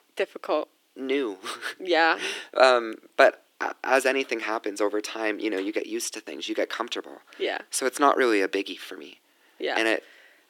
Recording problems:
thin; somewhat; fading below 300 Hz

